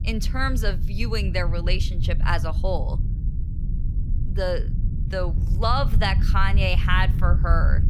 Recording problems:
low rumble; noticeable; throughout; 15 dB below the speech

